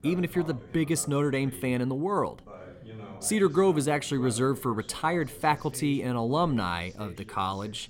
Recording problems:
voice in the background; noticeable; throughout; 20 dB below the speech

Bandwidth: 16.5 kHz